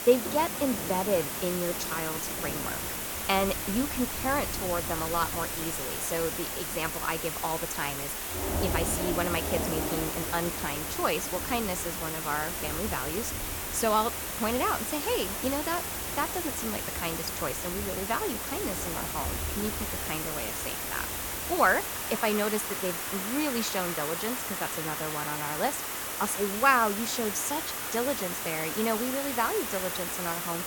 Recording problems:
rain or running water; loud; throughout; 10 dB below the speech
hiss; loud; throughout; 1 dB below the speech

